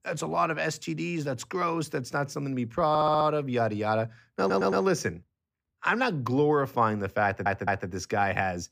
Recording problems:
audio stuttering; at 3 s, at 4.5 s and at 7 s

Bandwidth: 15 kHz